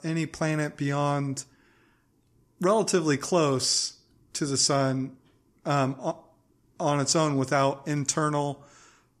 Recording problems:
none

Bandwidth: 14 kHz